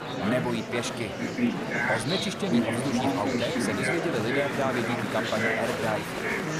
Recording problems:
murmuring crowd; very loud; throughout; 2 dB above the speech

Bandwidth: 14.5 kHz